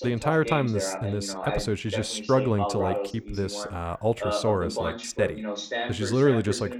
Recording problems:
voice in the background; loud; throughout; 5 dB below the speech

